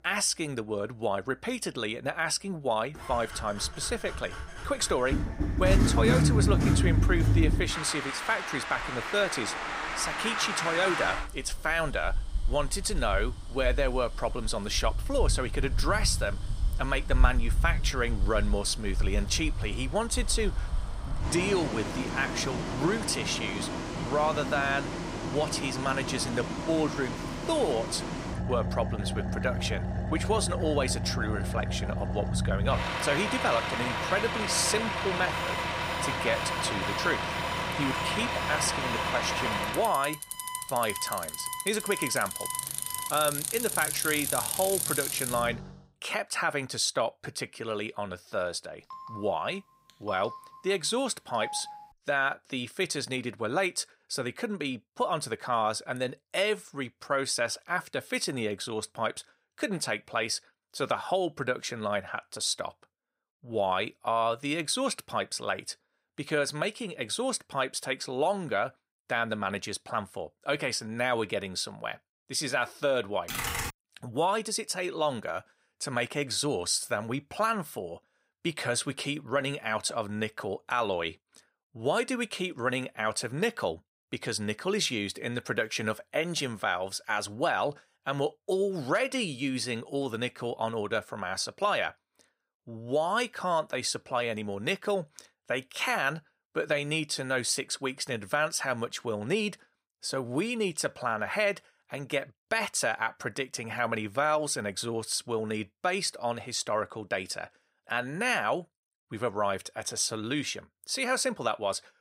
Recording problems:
traffic noise; loud; until 45 s; 1 dB below the speech
alarm; noticeable; from 35 to 43 s; peak 9 dB below the speech
phone ringing; noticeable; from 49 to 52 s; peak 10 dB below the speech
keyboard typing; noticeable; at 1:13; peak level with the speech

